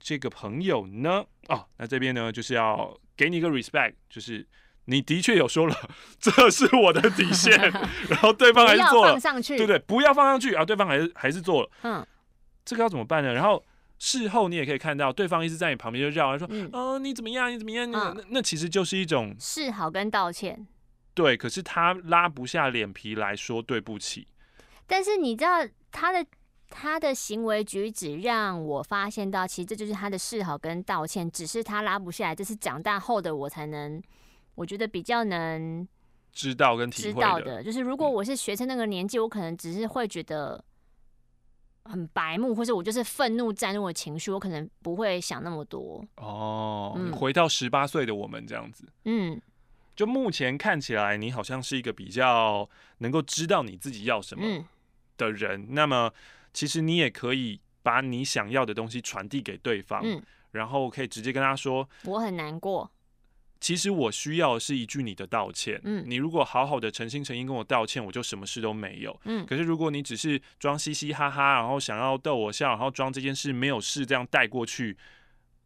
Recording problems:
none

